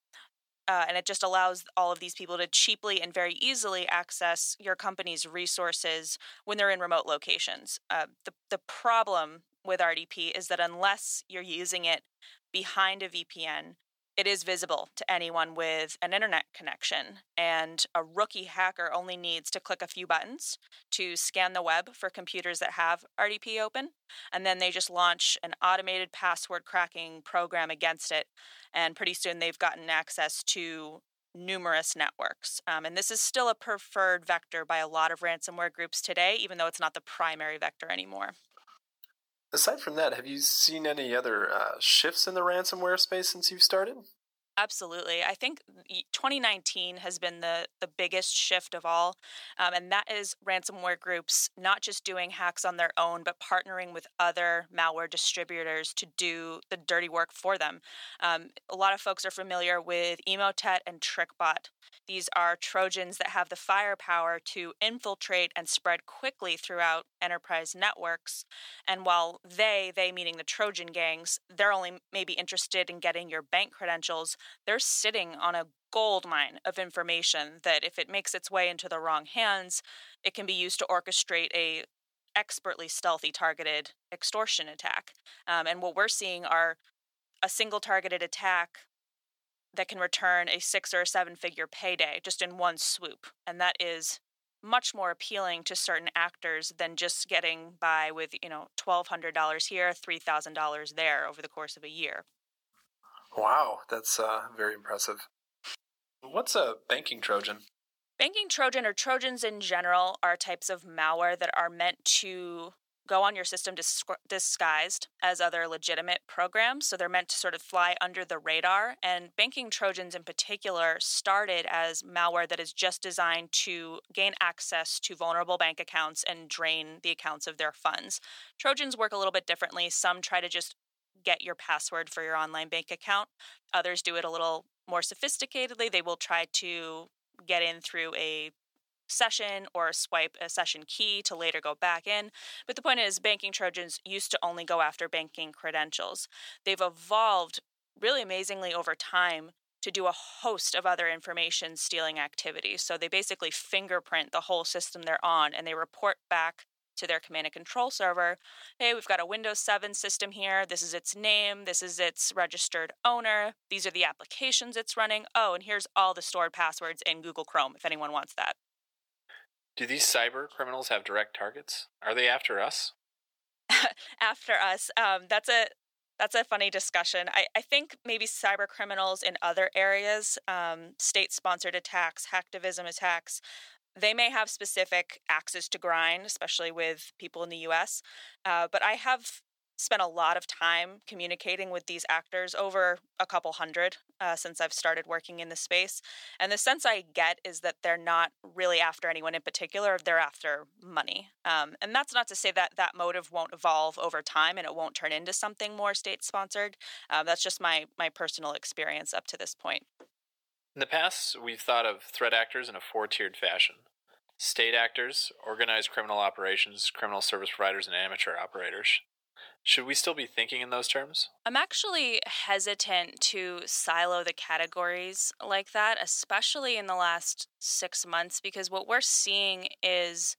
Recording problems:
thin; very; fading below 700 Hz

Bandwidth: 18.5 kHz